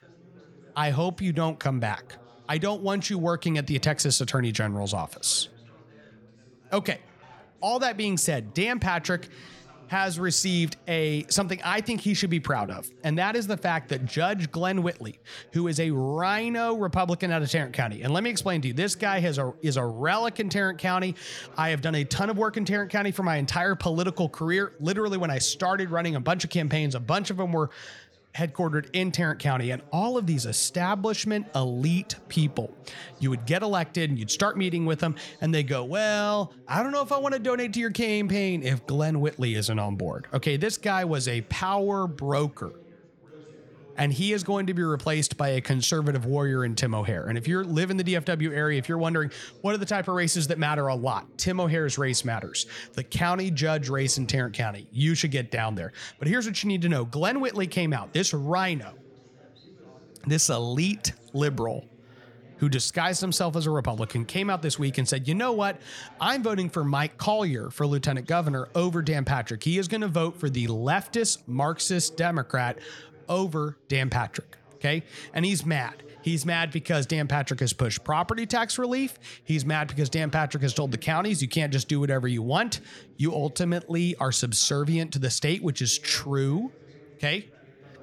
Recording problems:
background chatter; faint; throughout; 3 voices, 25 dB below the speech

